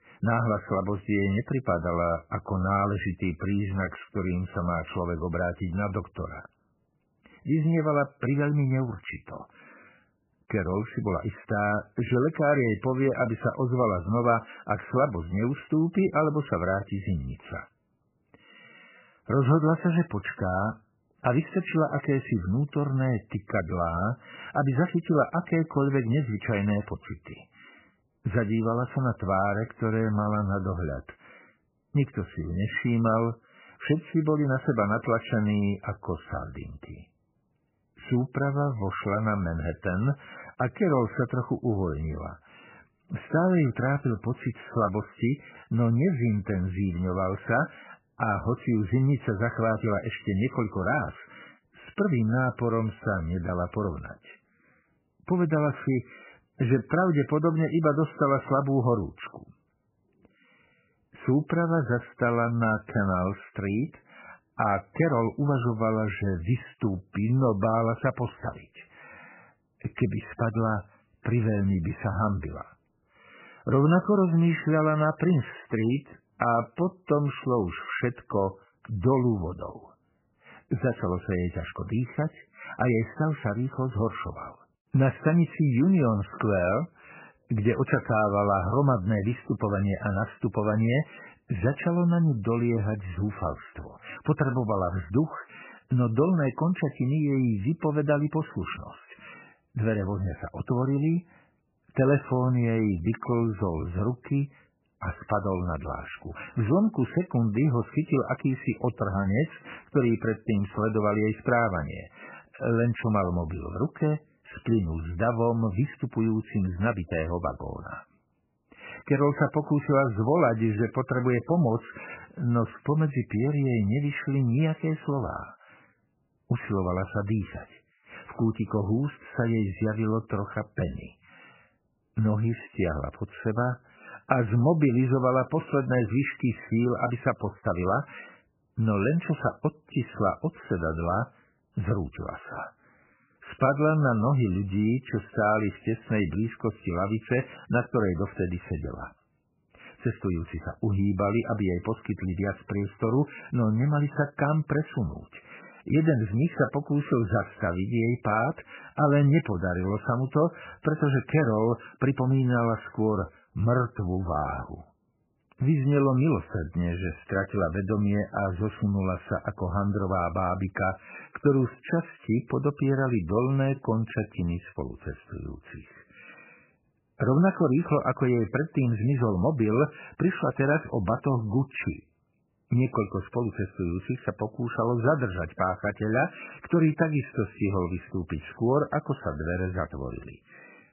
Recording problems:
garbled, watery; badly; nothing above 3 kHz

